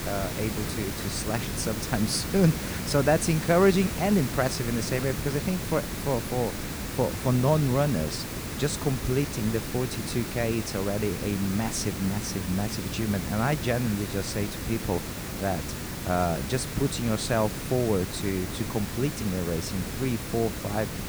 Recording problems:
hiss; loud; throughout; 5 dB below the speech

